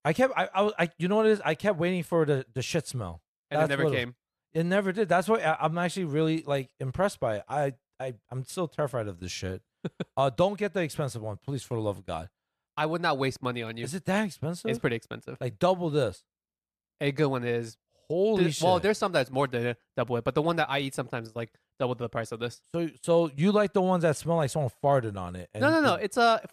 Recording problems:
none

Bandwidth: 14.5 kHz